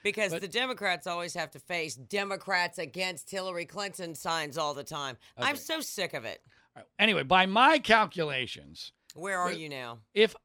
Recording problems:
none

